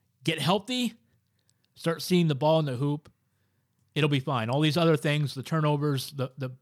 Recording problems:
none

